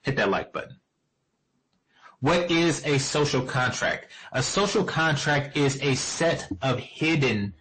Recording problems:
distortion; heavy; 6 dB below the speech
garbled, watery; slightly; nothing above 8 kHz

